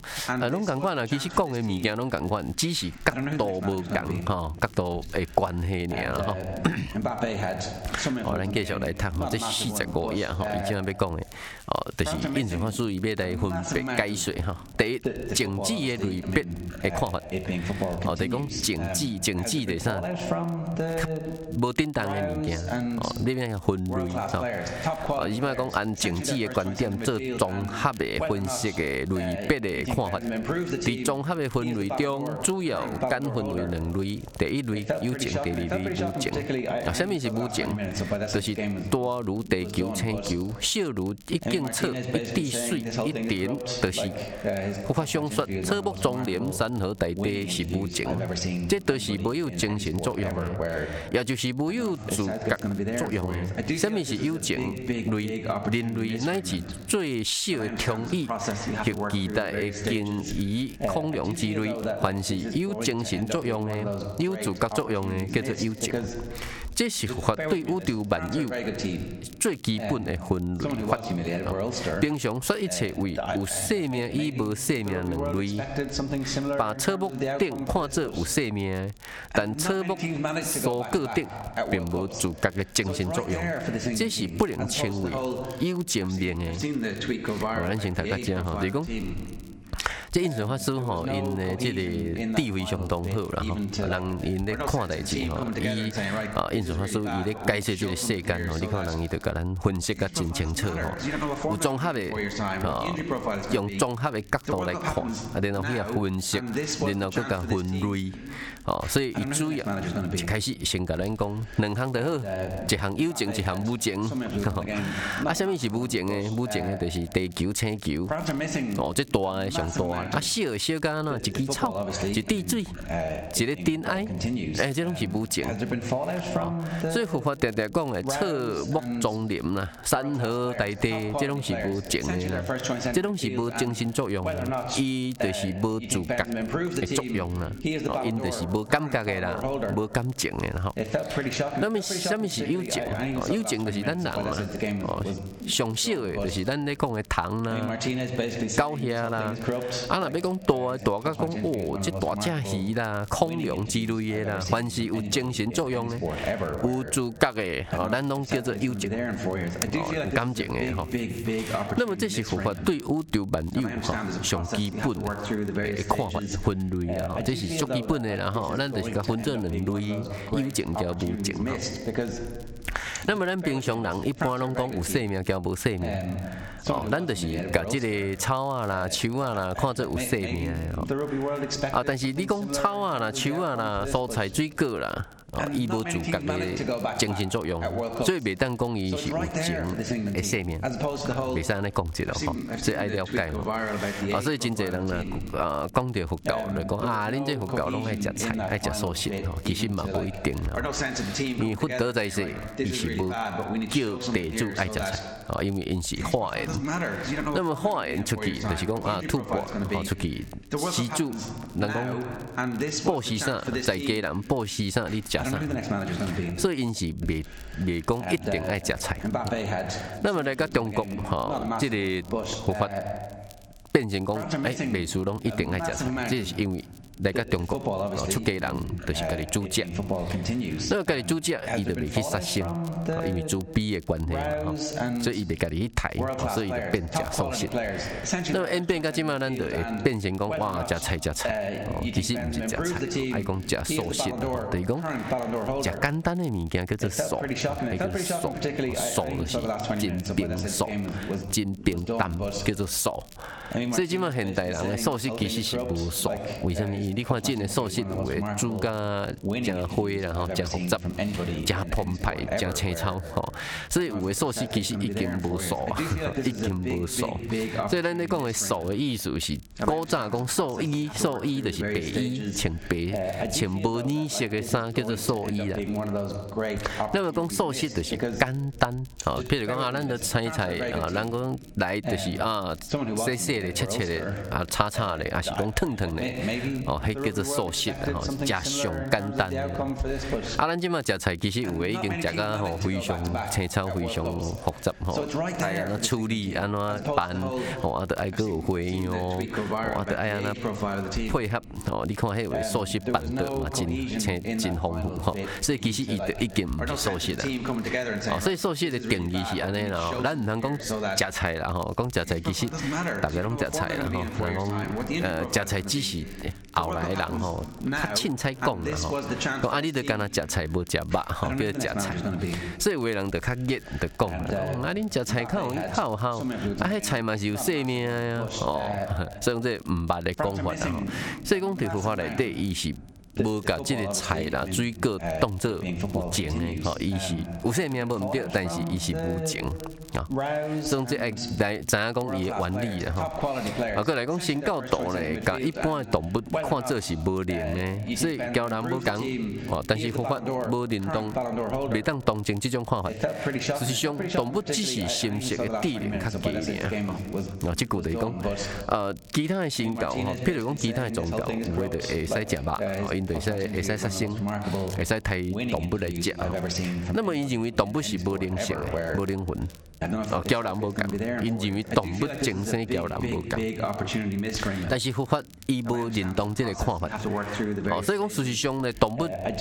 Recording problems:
squashed, flat; somewhat, background pumping
voice in the background; loud; throughout; 4 dB below the speech
crackle, like an old record; faint; 25 dB below the speech

